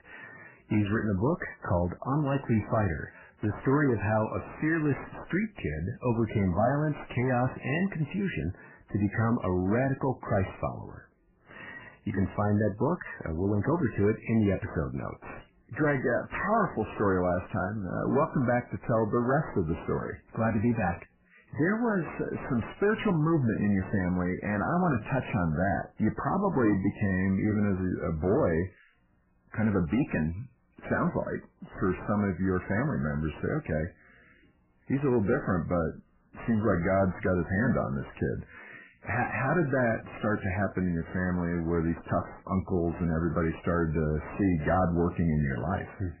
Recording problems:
garbled, watery; badly; nothing above 3 kHz
distortion; slight; 9 dB below the speech

